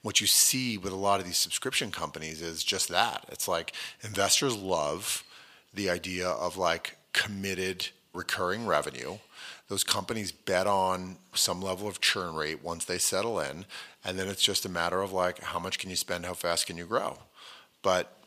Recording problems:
thin; somewhat; fading below 750 Hz

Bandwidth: 15 kHz